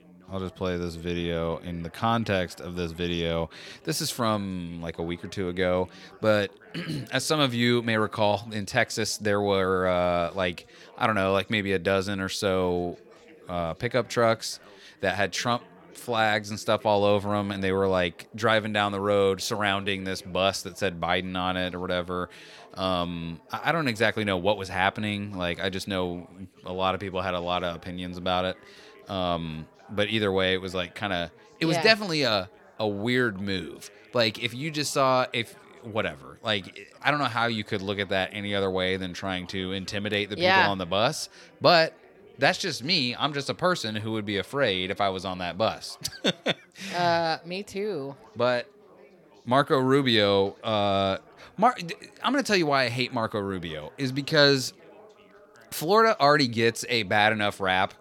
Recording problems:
background chatter; faint; throughout; 3 voices, 25 dB below the speech

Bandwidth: 17 kHz